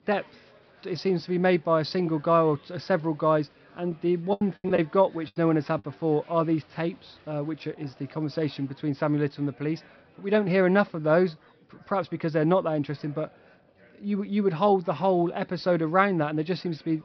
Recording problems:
high frequencies cut off; noticeable; nothing above 5.5 kHz
murmuring crowd; faint; throughout; 30 dB below the speech
choppy; very; from 4.5 to 6 s; 18% of the speech affected

